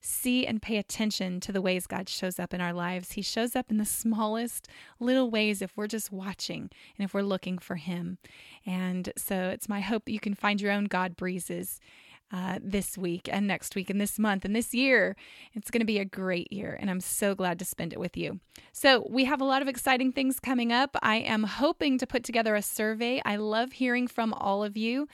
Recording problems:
none

